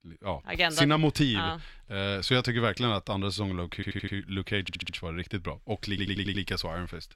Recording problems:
audio stuttering; at 4 s, at 4.5 s and at 6 s

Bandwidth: 16 kHz